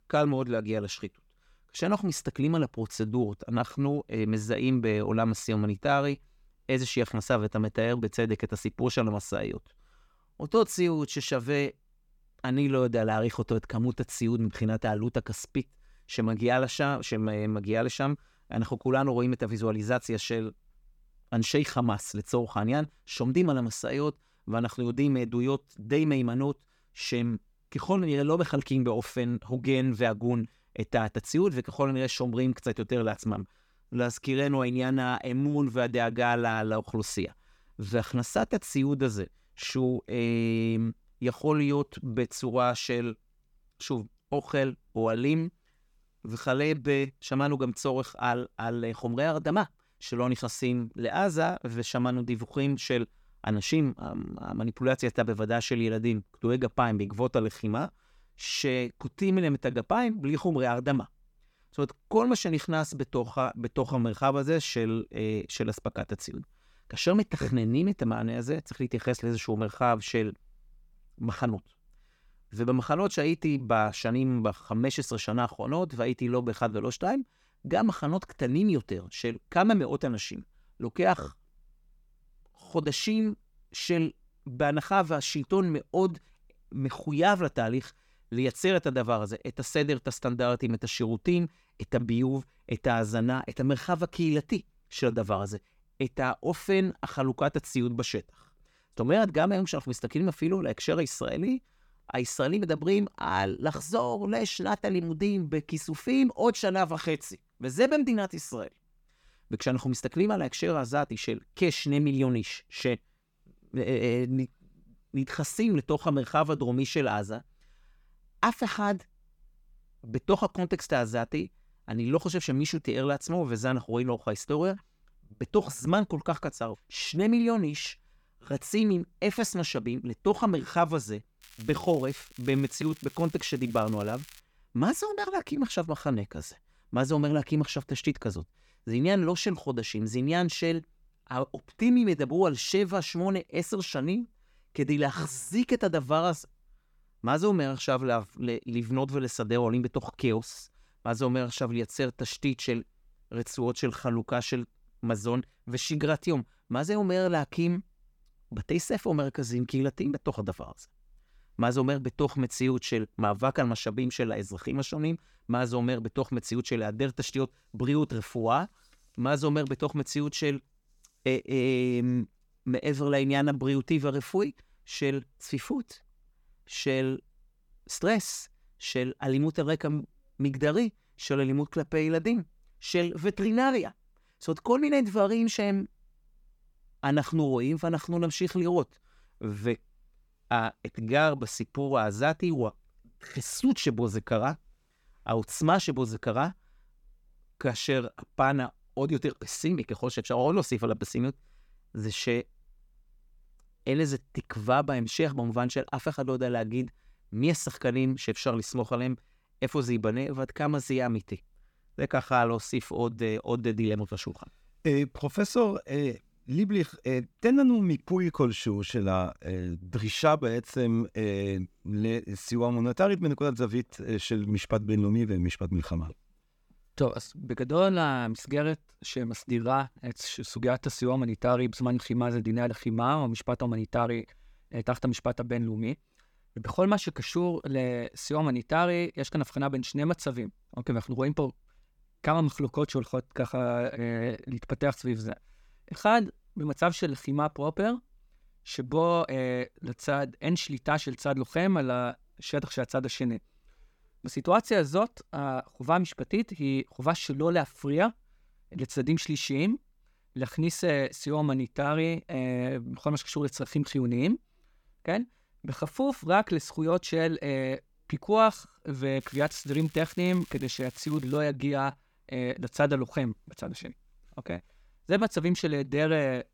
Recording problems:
crackling; faint; from 2:11 to 2:14 and from 4:29 to 4:31; 20 dB below the speech

